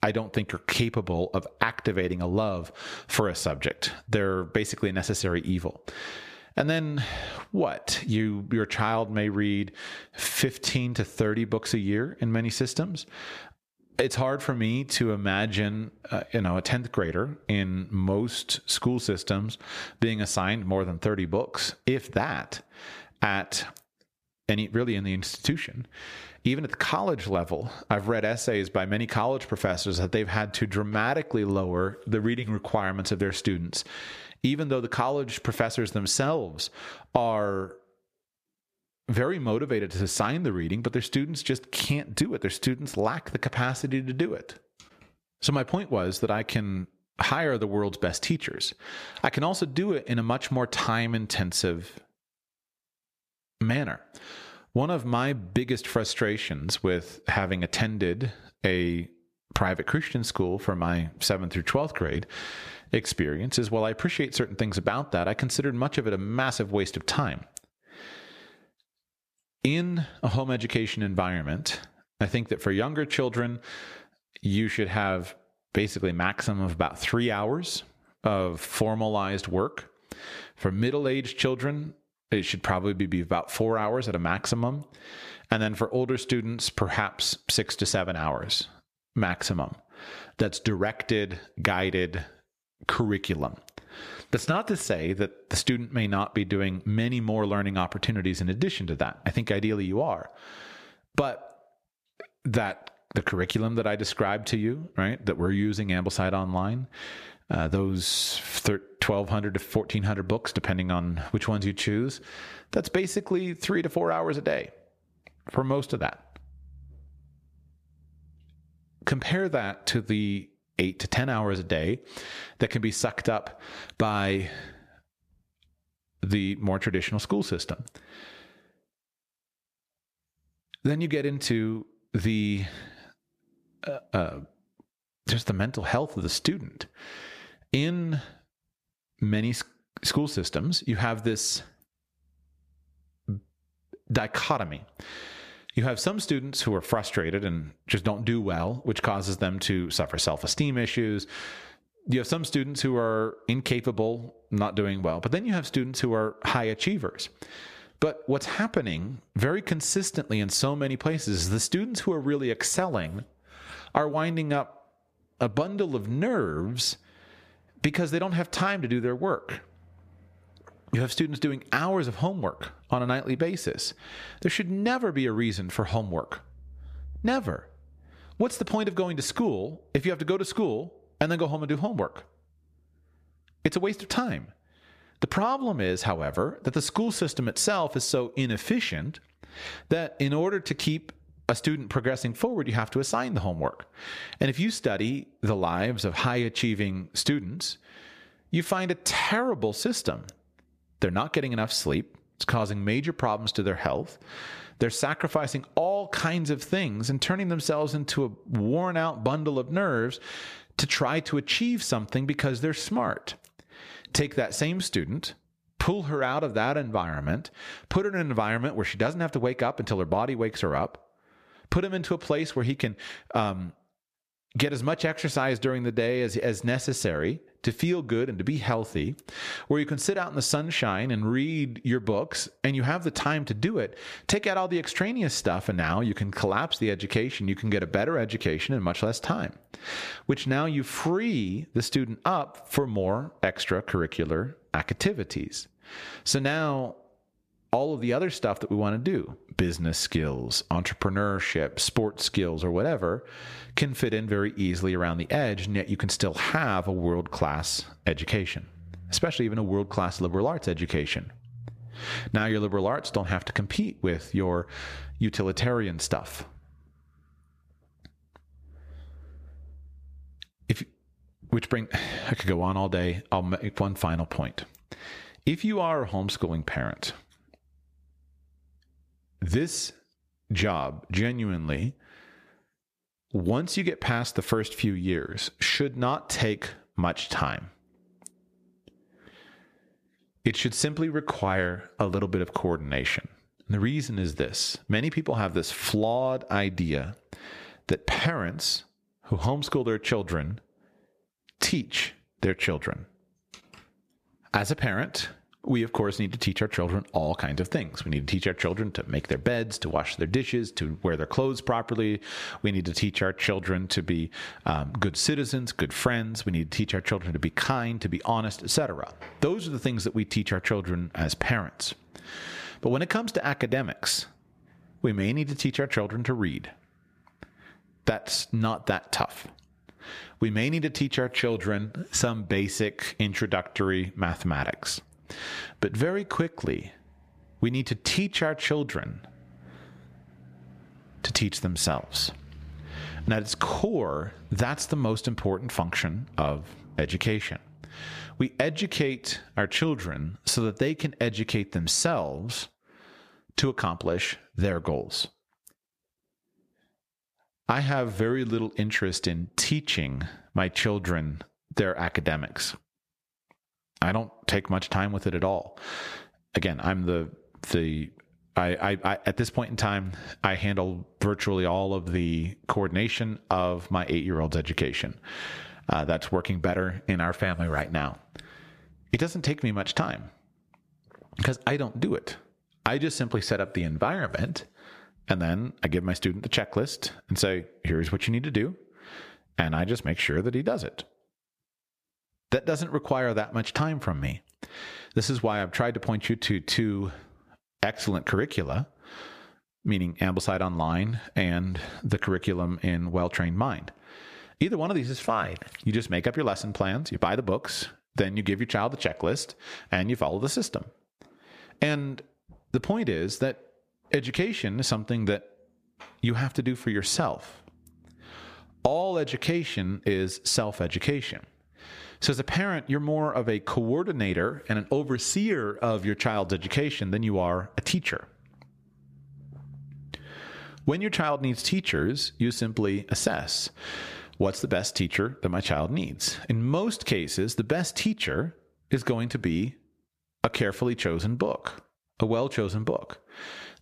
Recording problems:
squashed, flat; somewhat

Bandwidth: 14.5 kHz